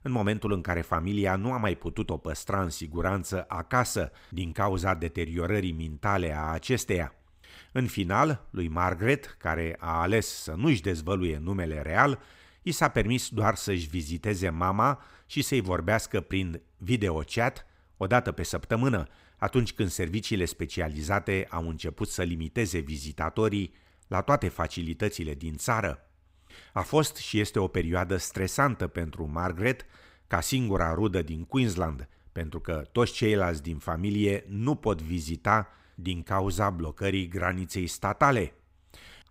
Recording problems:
none

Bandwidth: 15.5 kHz